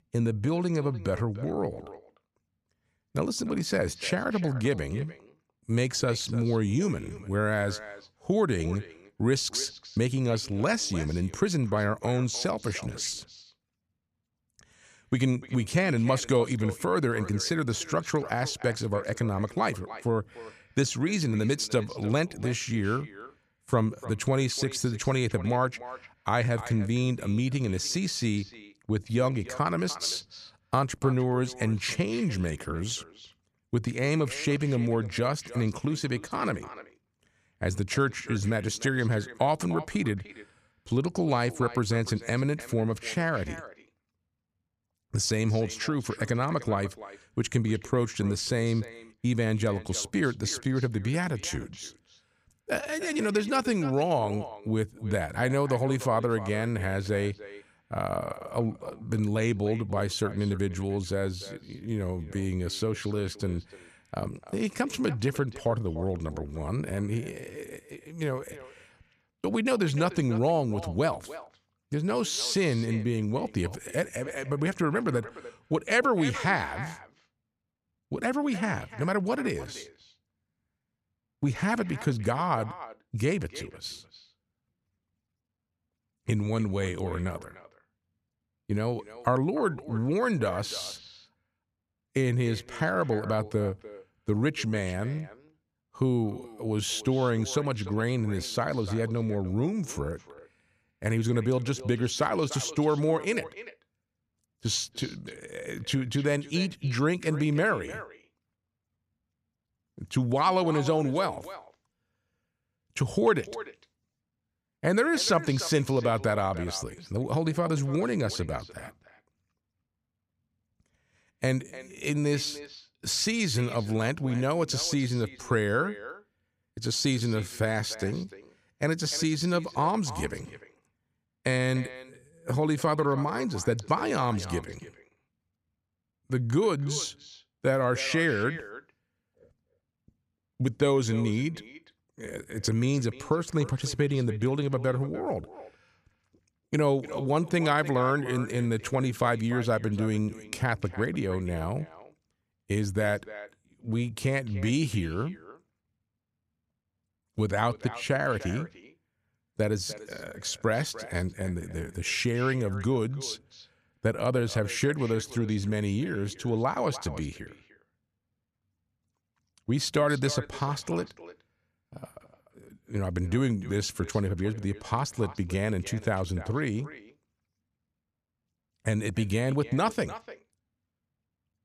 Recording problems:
echo of what is said; noticeable; throughout; 300 ms later, 15 dB below the speech

